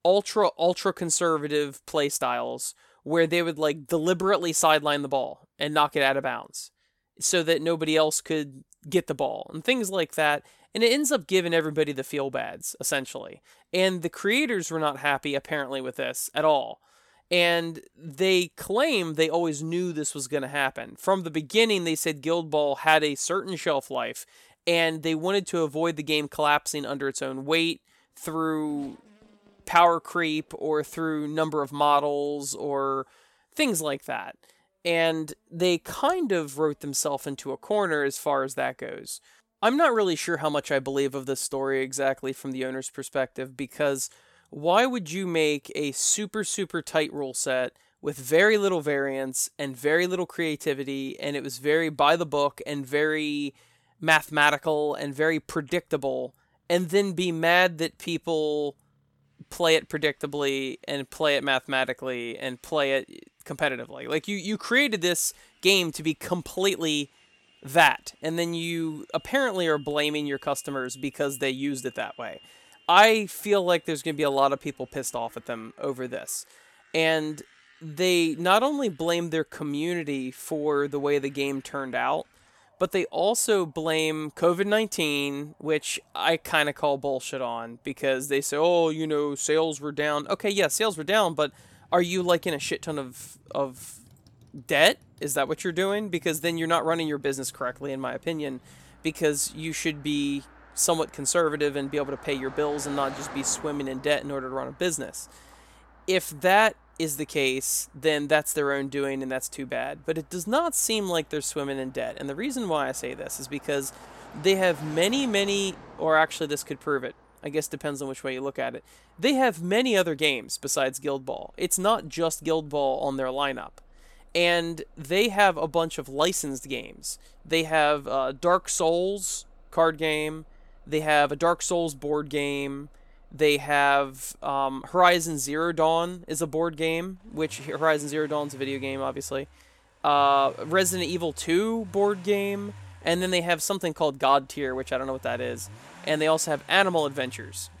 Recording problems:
traffic noise; faint; throughout; 25 dB below the speech

